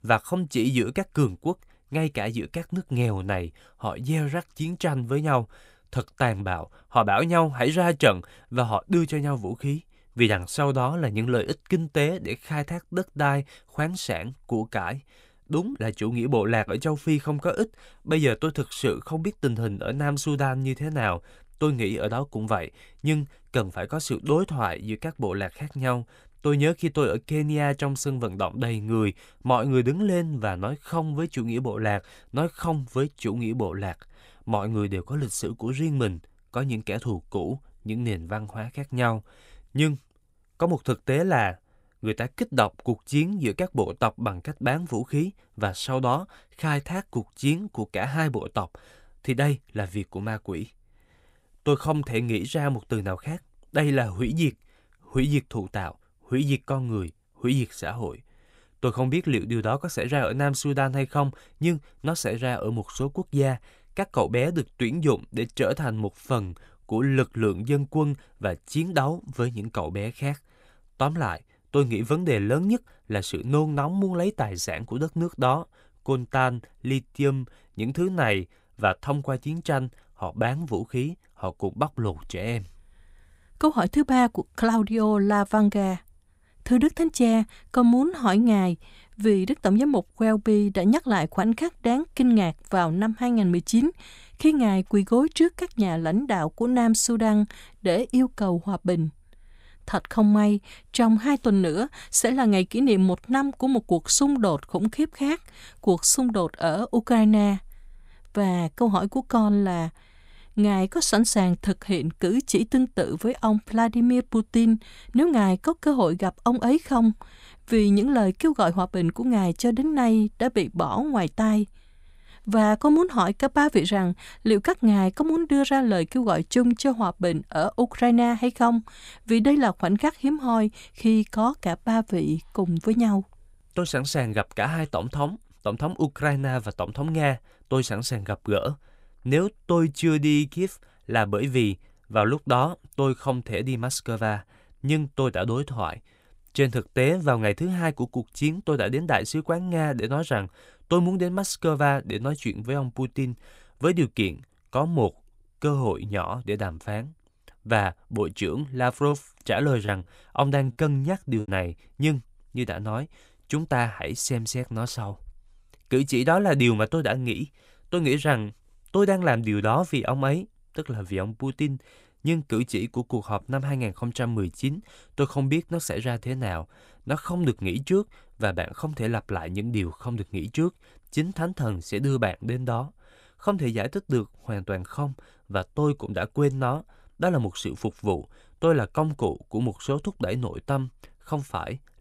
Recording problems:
choppy; very; from 2:39 to 2:41; 7% of the speech affected

